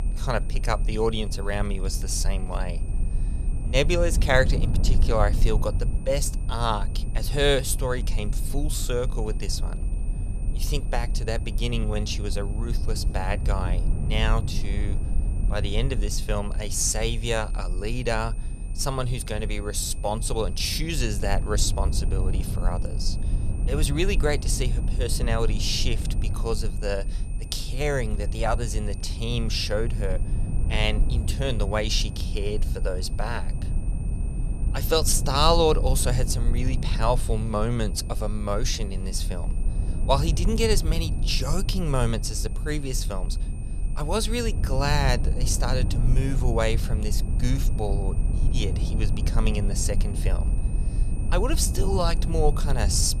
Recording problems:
low rumble; noticeable; throughout; 15 dB below the speech
high-pitched whine; faint; throughout; 9 kHz, 20 dB below the speech

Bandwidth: 14.5 kHz